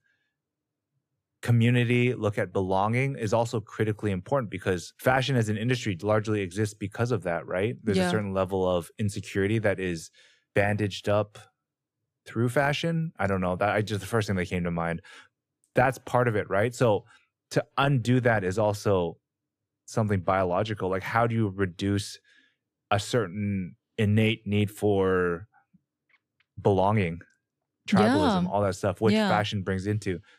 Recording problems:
none

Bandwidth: 14.5 kHz